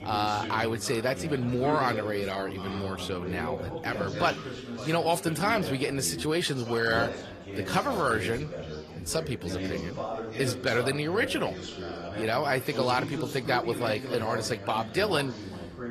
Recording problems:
garbled, watery; slightly; nothing above 14.5 kHz
background chatter; loud; throughout; 4 voices, 8 dB below the speech

